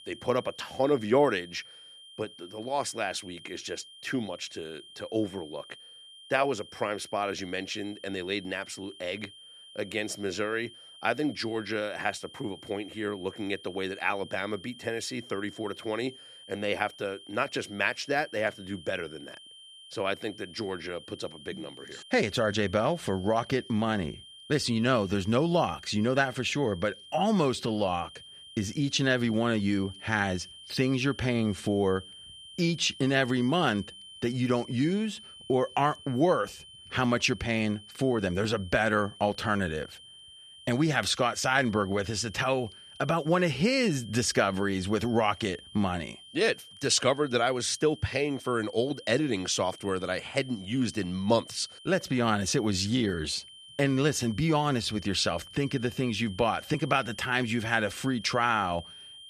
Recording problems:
high-pitched whine; noticeable; throughout; 3 kHz, 20 dB below the speech

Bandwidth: 14.5 kHz